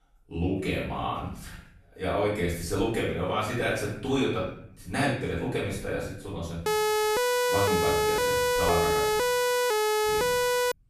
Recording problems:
off-mic speech; far
room echo; noticeable; dies away in 0.6 s
siren; loud; from 6.5 s on; peak 5 dB above the speech

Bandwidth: 14.5 kHz